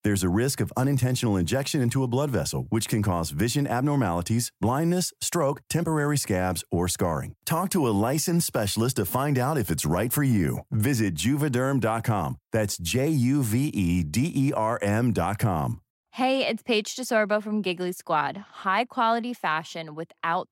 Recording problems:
none

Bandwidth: 16 kHz